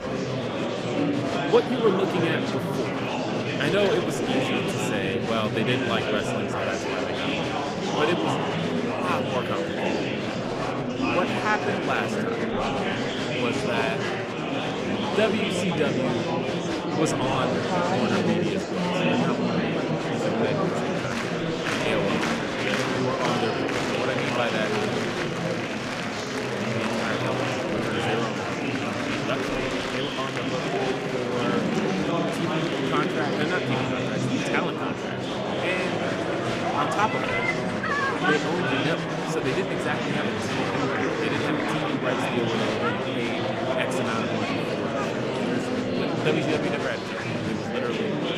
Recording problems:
murmuring crowd; very loud; throughout; 4 dB above the speech

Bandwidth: 15.5 kHz